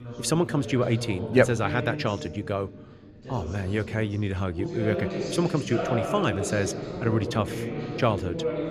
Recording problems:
background chatter; loud; throughout; 2 voices, 6 dB below the speech

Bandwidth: 14 kHz